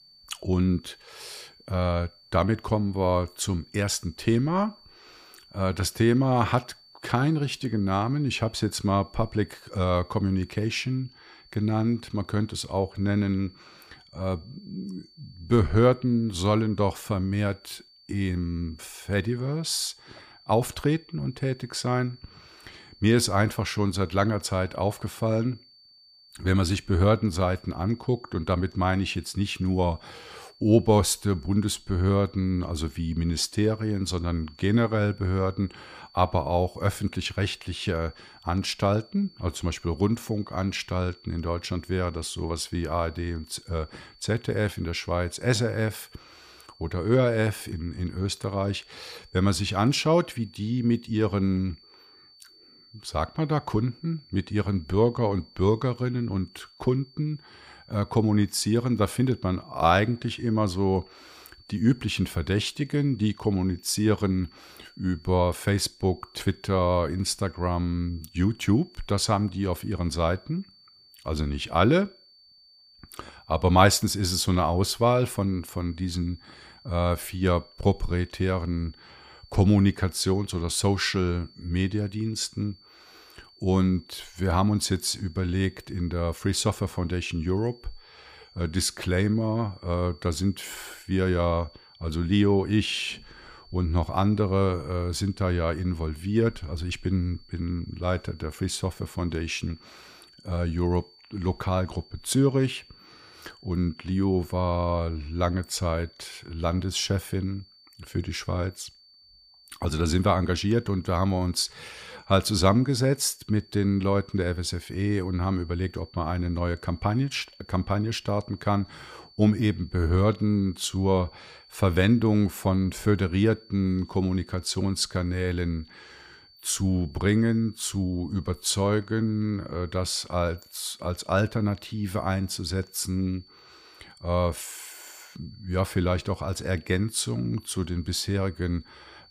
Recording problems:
high-pitched whine; faint; throughout; 4.5 kHz, 25 dB below the speech

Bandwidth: 15 kHz